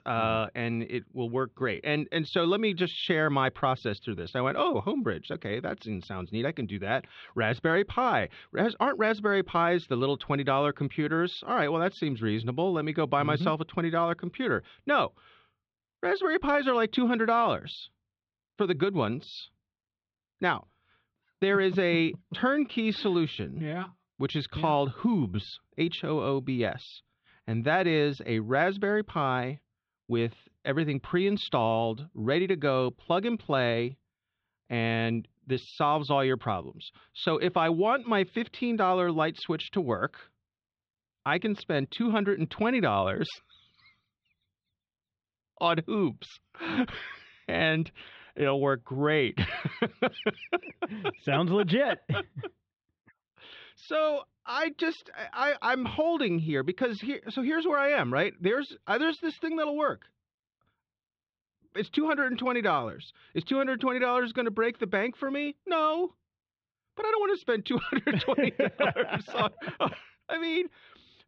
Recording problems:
muffled; slightly; fading above 3.5 kHz

